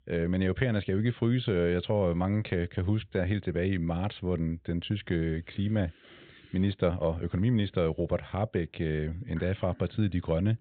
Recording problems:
high frequencies cut off; severe; nothing above 4 kHz

